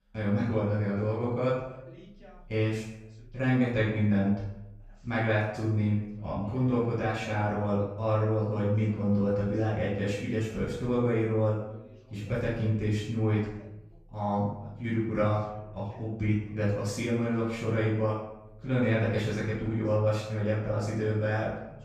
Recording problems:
off-mic speech; far
room echo; noticeable; dies away in 0.7 s
voice in the background; faint; throughout; 25 dB below the speech

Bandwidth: 15 kHz